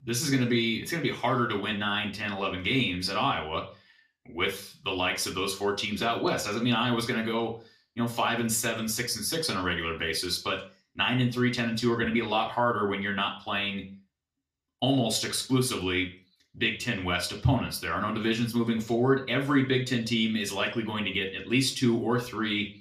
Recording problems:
off-mic speech; far
room echo; slight; dies away in 0.4 s

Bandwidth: 15 kHz